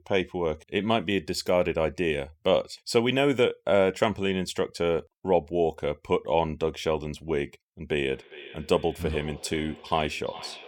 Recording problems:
echo of what is said; noticeable; from 8 s on; 410 ms later, 15 dB below the speech

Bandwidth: 17.5 kHz